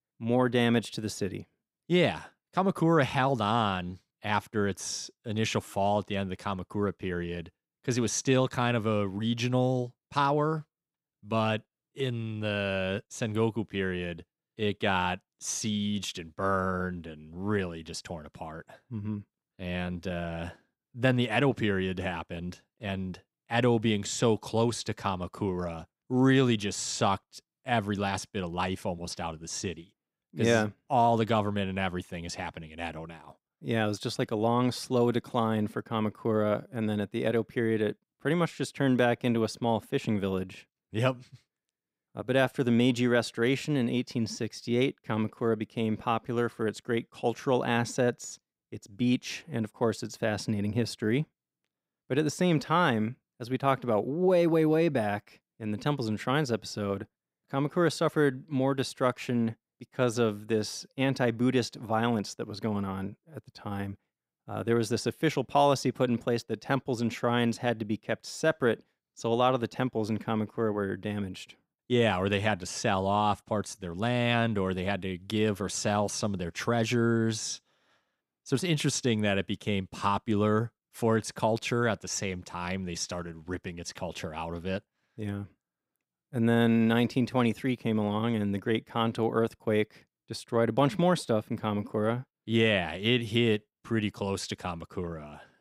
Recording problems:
none

